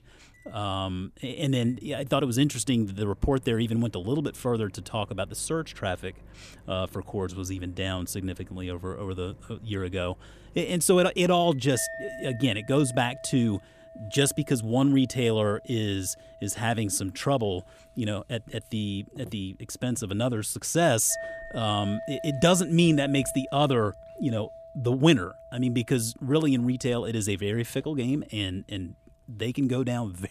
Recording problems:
household noises; noticeable; throughout; 20 dB below the speech

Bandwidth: 14.5 kHz